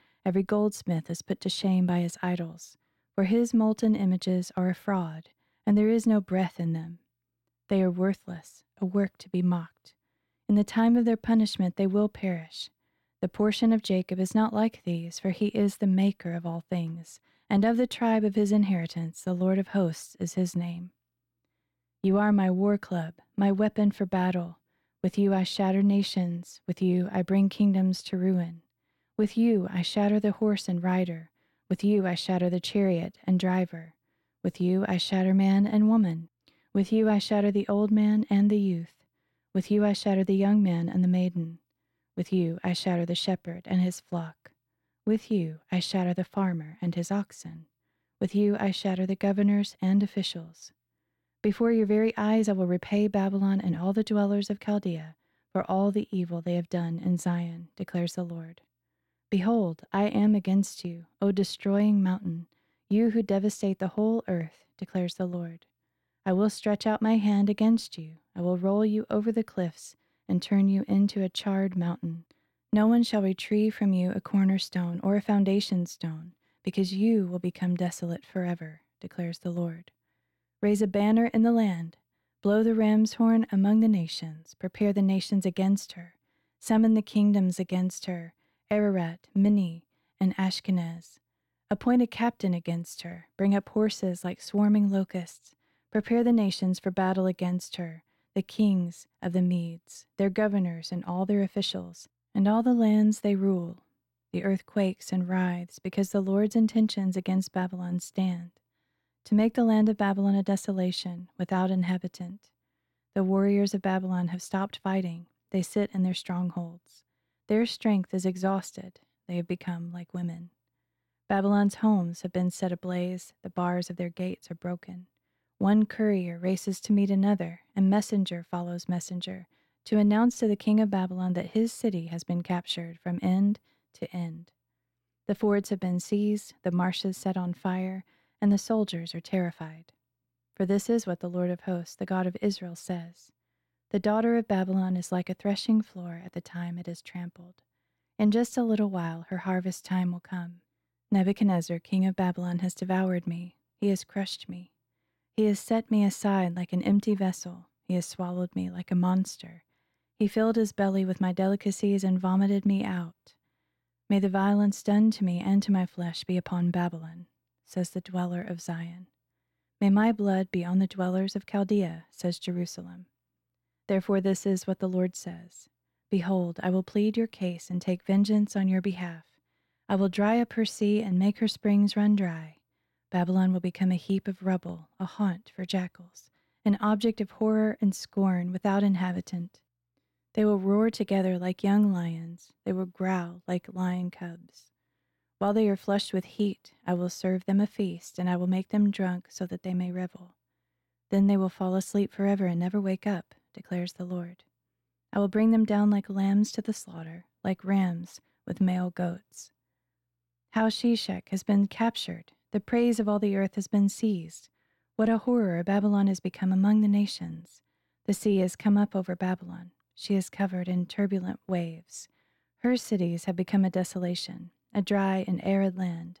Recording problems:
none

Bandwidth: 18.5 kHz